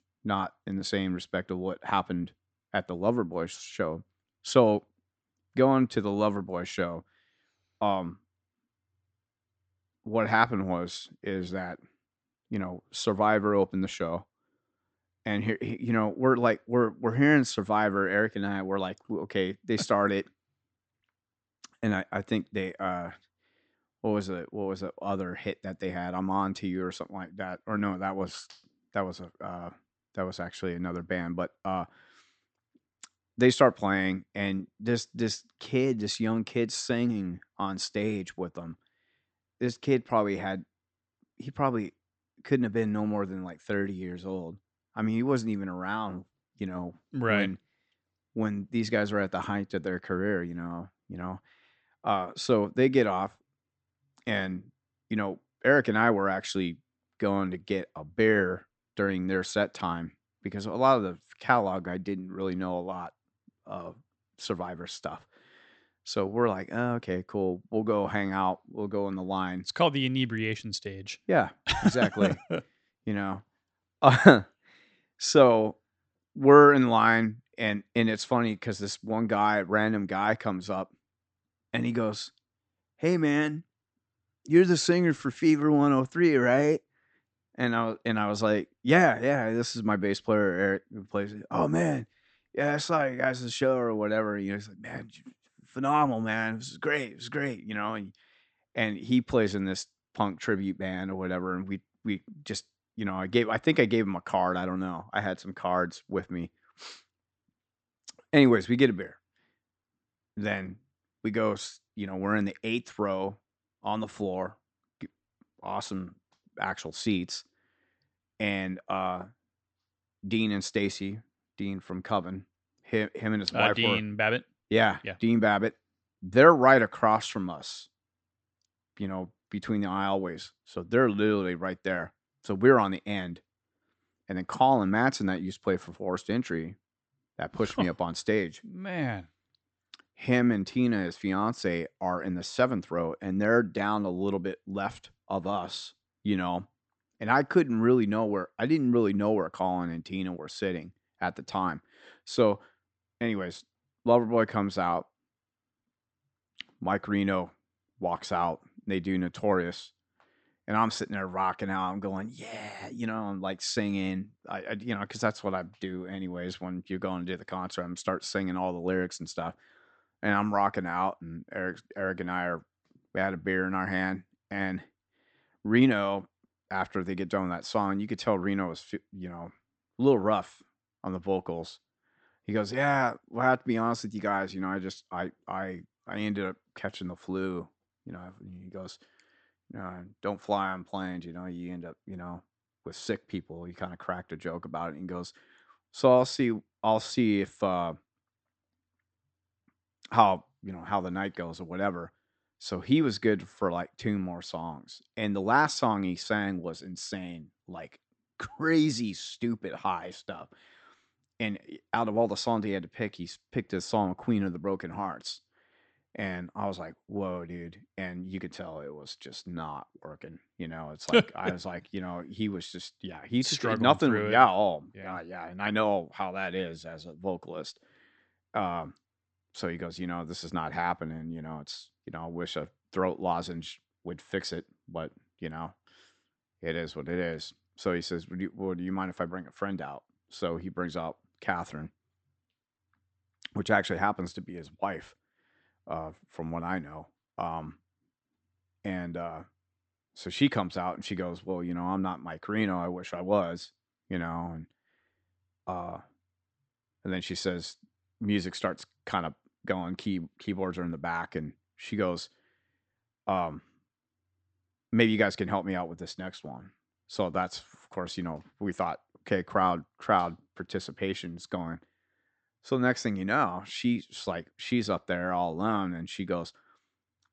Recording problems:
high frequencies cut off; noticeable; nothing above 8 kHz

